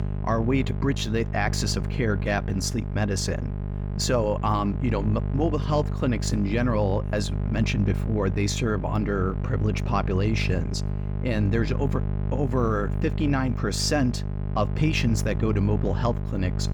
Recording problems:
electrical hum; noticeable; throughout; 50 Hz, 10 dB below the speech

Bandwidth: 18.5 kHz